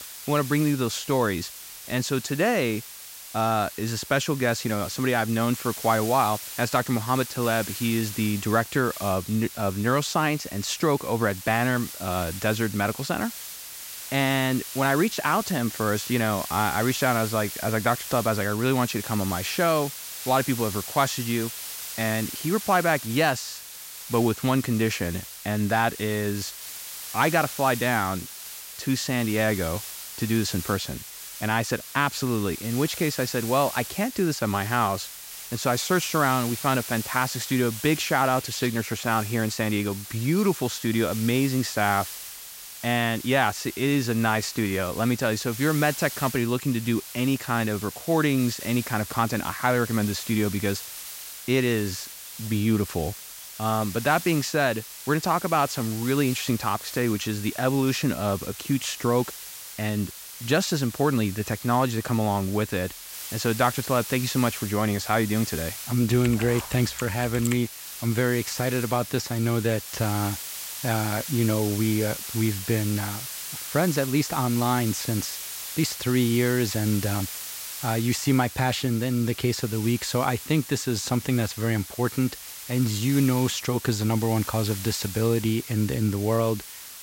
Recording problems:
hiss; loud; throughout; 10 dB below the speech

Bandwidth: 16 kHz